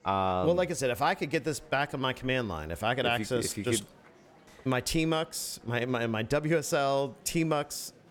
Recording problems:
murmuring crowd; faint; throughout; 25 dB below the speech

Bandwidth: 17 kHz